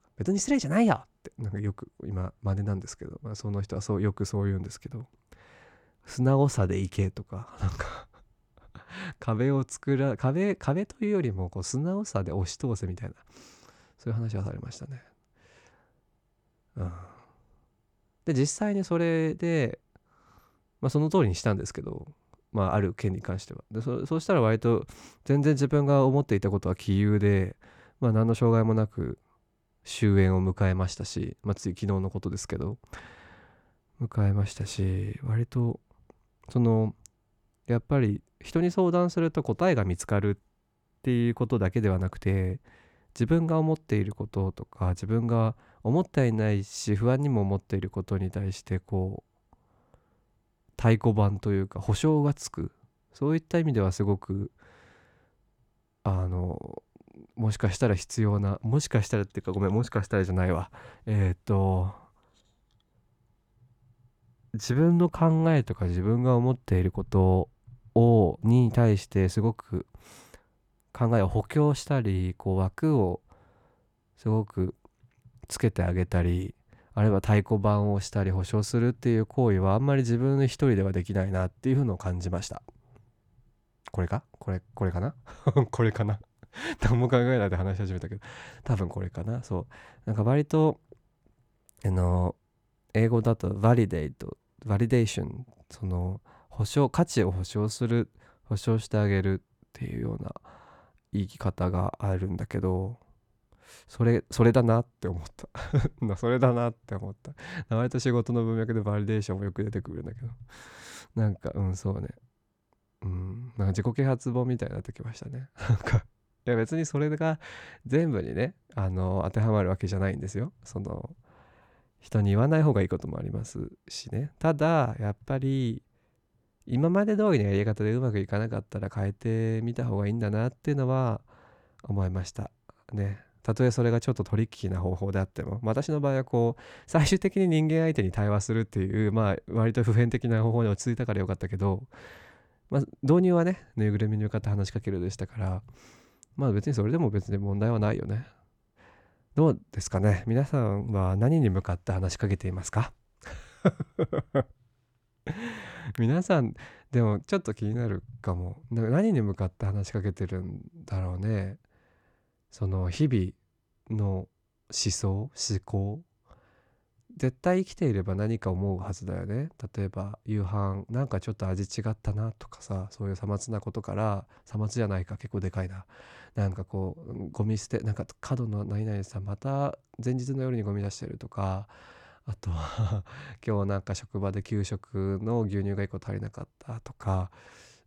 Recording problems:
none

